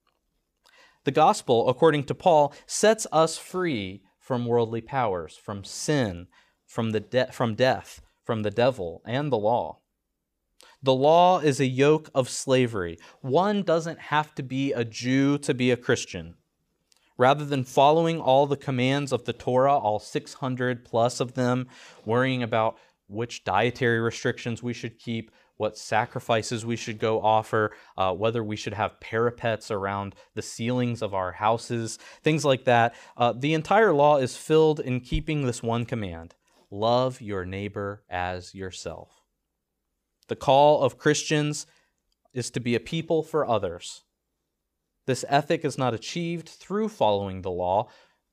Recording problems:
none

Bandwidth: 15 kHz